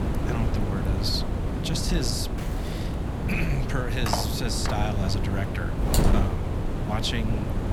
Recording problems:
wind noise on the microphone; heavy; 2 dB below the speech
footsteps; faint; at 2.5 s; peak 10 dB below the speech
clattering dishes; noticeable; at 4 s; peak 1 dB below the speech
keyboard typing; noticeable; at 6 s; peak 2 dB below the speech

